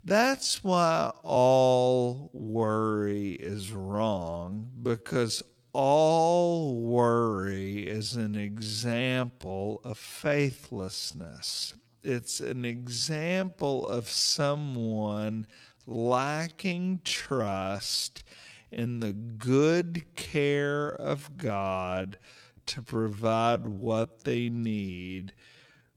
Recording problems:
wrong speed, natural pitch; too slow; 0.5 times normal speed

